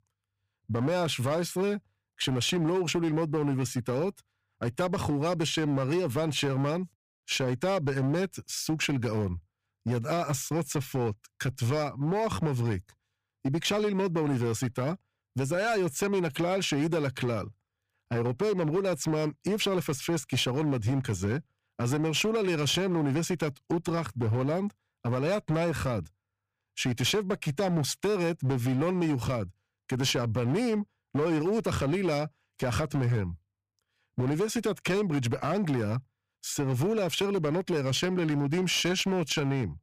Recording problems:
distortion; slight; 10% of the sound clipped

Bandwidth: 15 kHz